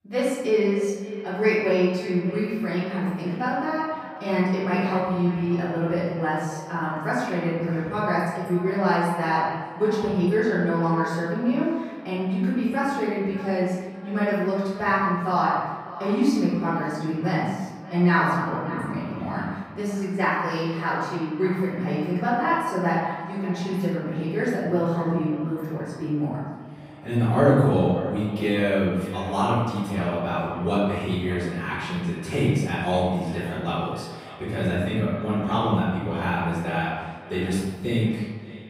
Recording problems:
room echo; strong; dies away in 1.1 s
off-mic speech; far
echo of what is said; noticeable; throughout; 590 ms later, 15 dB below the speech

